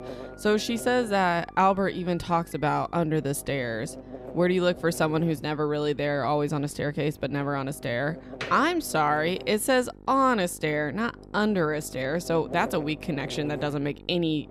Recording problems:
electrical hum; noticeable; throughout; 50 Hz, 20 dB below the speech
door banging; faint; from 7.5 to 8.5 s; peak 10 dB below the speech

